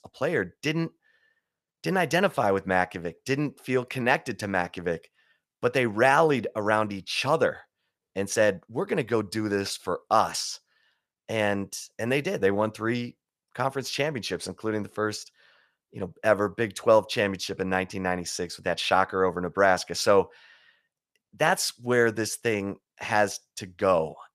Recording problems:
none

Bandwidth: 15 kHz